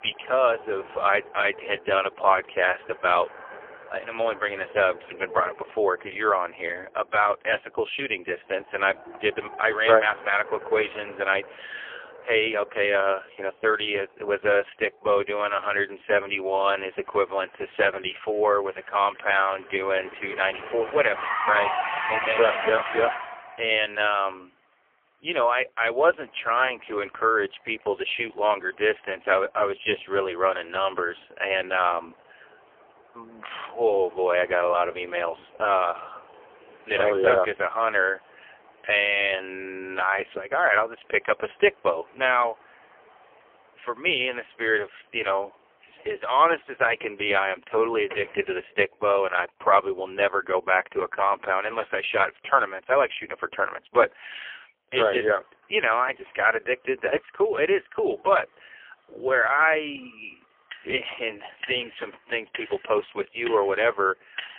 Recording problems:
phone-call audio; poor line; nothing above 3.5 kHz
traffic noise; noticeable; throughout; 10 dB below the speech

